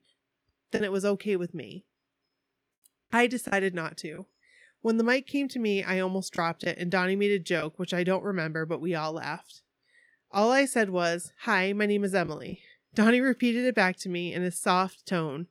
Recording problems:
choppy; occasionally; from 1 to 4 s; 3% of the speech affected

